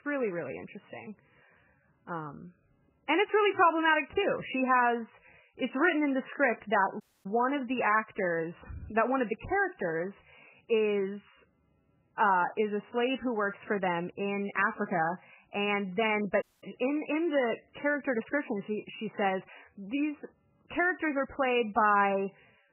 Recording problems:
garbled, watery; badly; nothing above 3 kHz
audio cutting out; at 7 s and at 16 s

